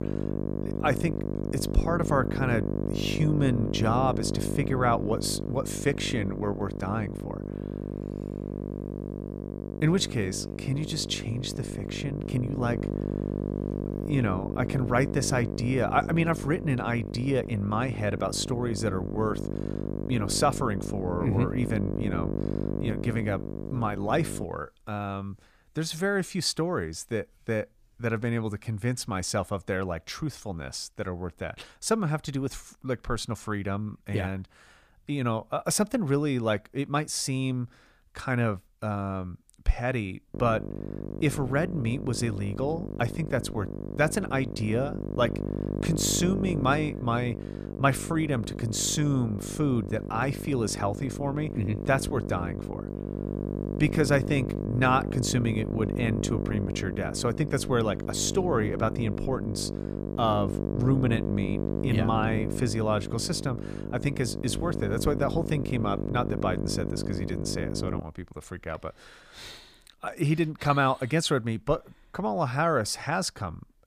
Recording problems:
electrical hum; loud; until 24 s and from 40 s to 1:08; 50 Hz, 8 dB below the speech

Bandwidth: 15 kHz